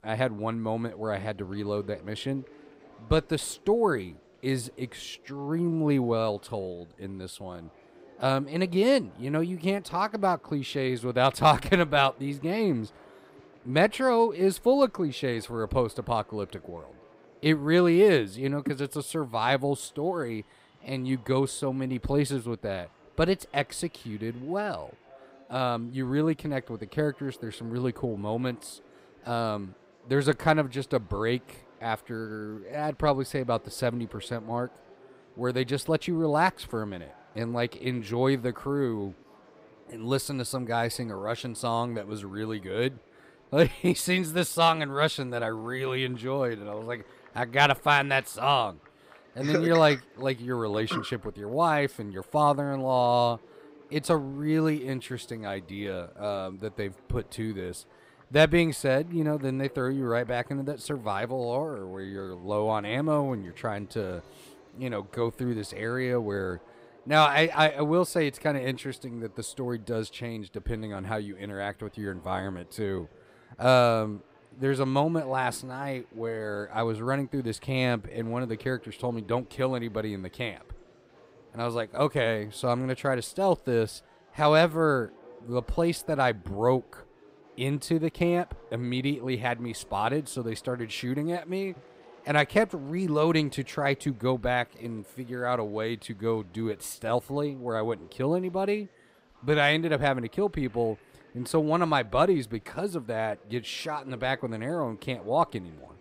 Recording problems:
murmuring crowd; faint; throughout; 25 dB below the speech

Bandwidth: 15.5 kHz